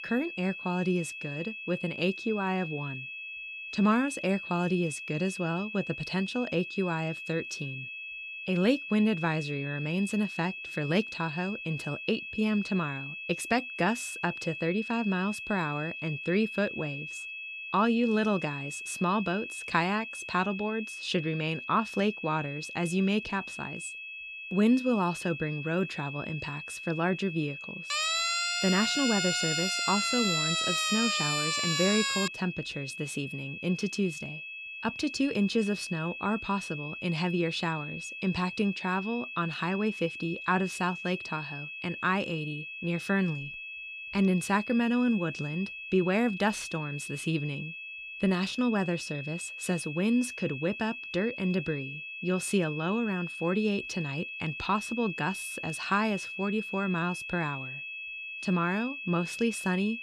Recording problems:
high-pitched whine; loud; throughout; 2.5 kHz, 7 dB below the speech
siren; loud; from 28 to 32 s; peak 4 dB above the speech

